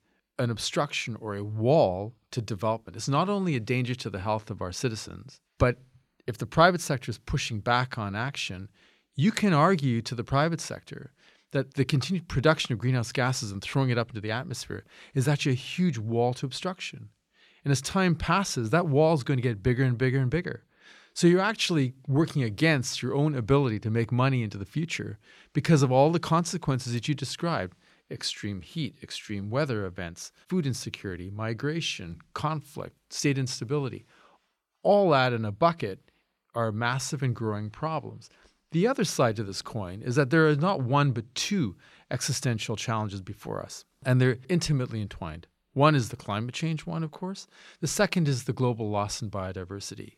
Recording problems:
none

